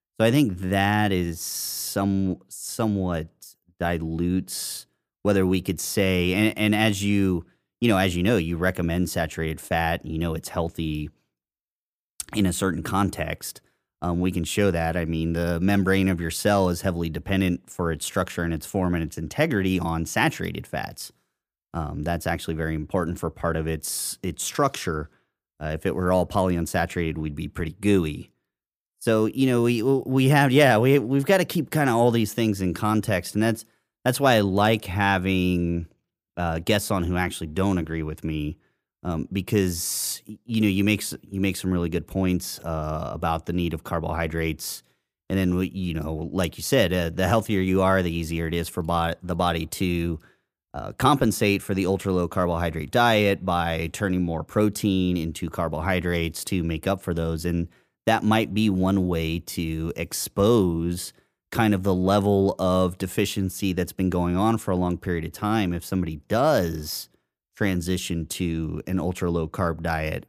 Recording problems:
none

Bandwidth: 15 kHz